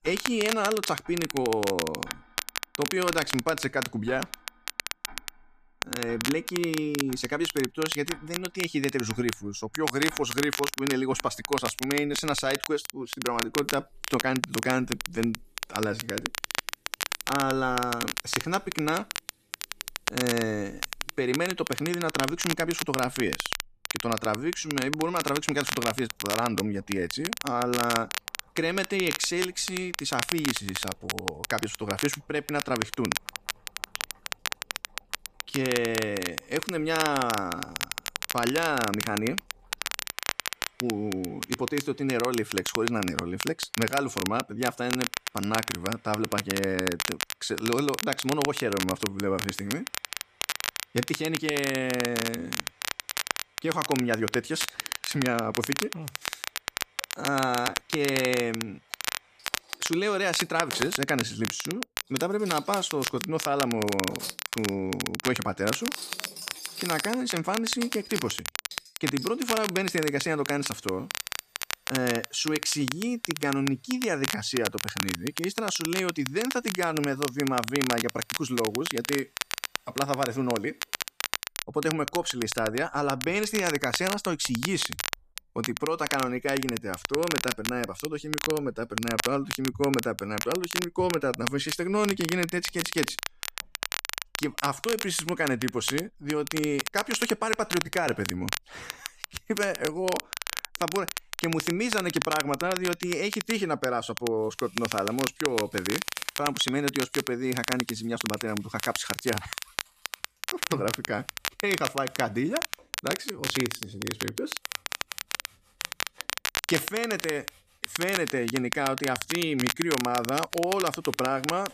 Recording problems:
crackle, like an old record; loud; 4 dB below the speech
household noises; faint; throughout; 20 dB below the speech

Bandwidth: 14.5 kHz